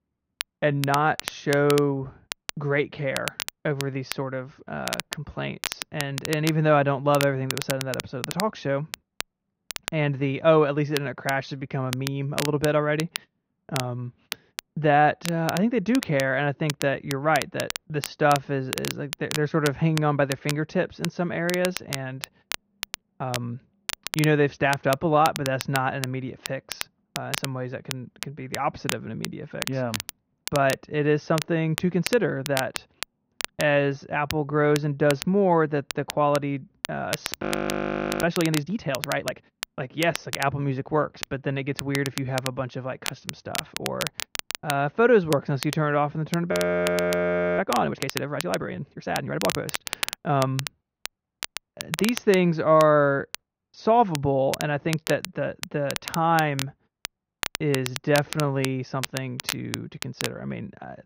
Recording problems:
high frequencies cut off; noticeable; nothing above 6.5 kHz
muffled; very slightly; fading above 3.5 kHz
crackle, like an old record; loud; 9 dB below the speech
audio freezing; at 37 s for 1 s and at 47 s for 1 s

